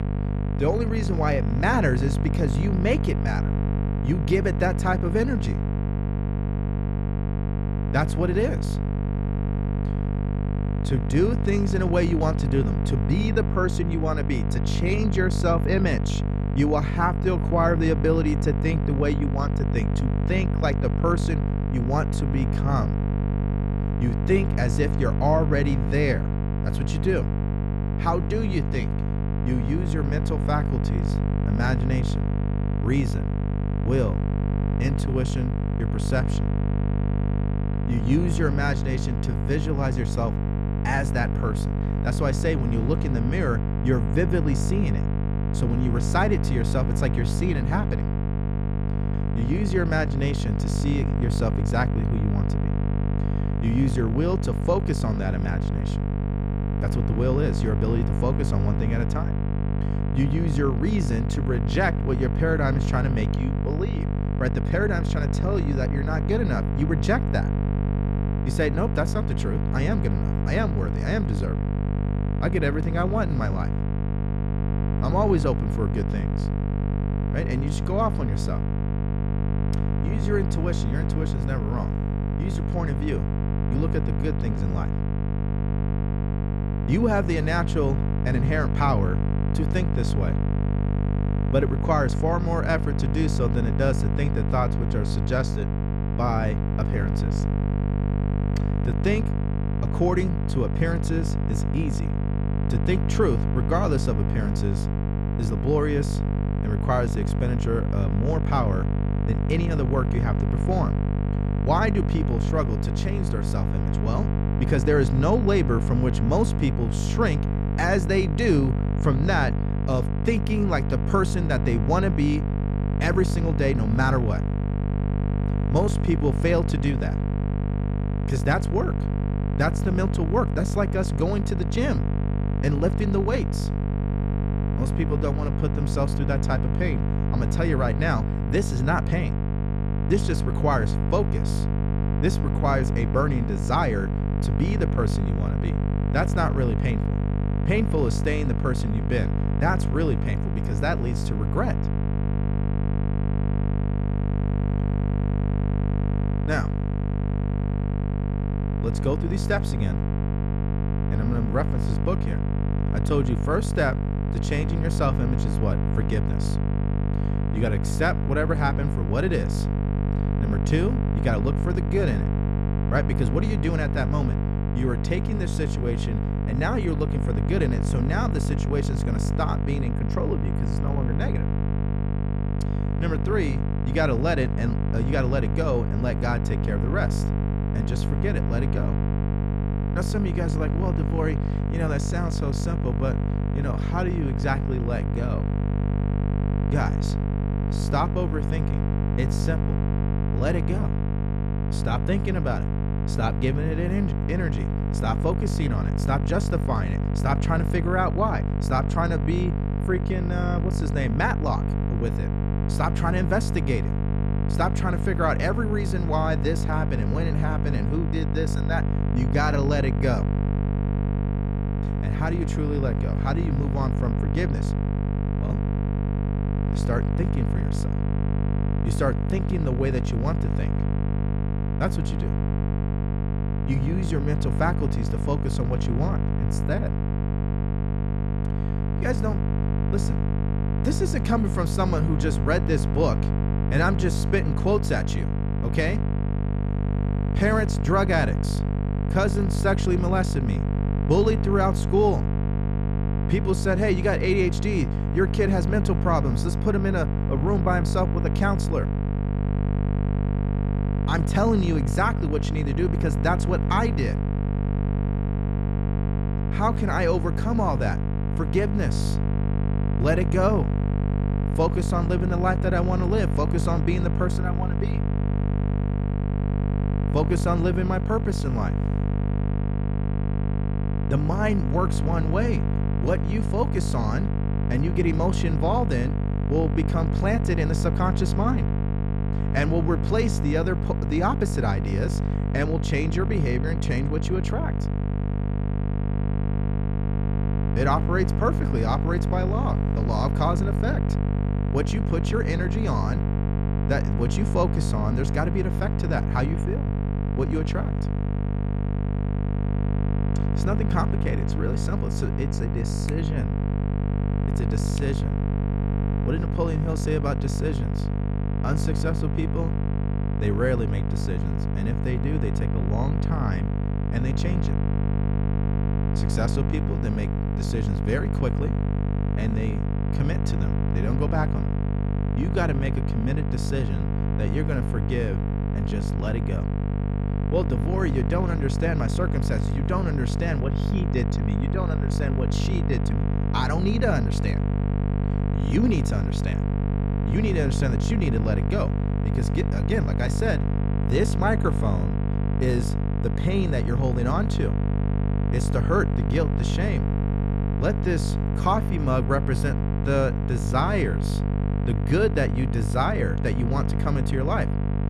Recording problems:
electrical hum; loud; throughout; 50 Hz, 6 dB below the speech

